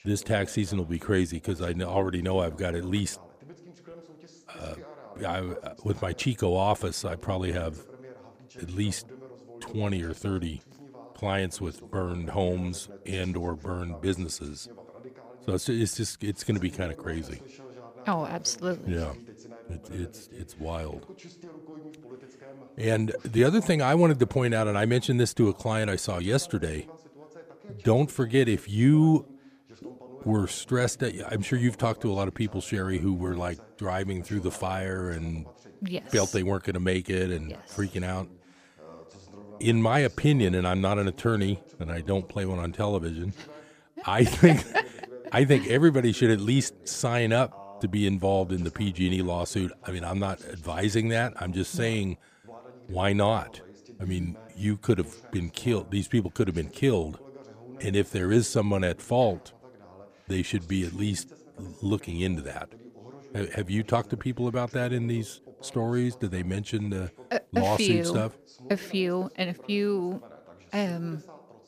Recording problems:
voice in the background; faint; throughout; 20 dB below the speech

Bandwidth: 15 kHz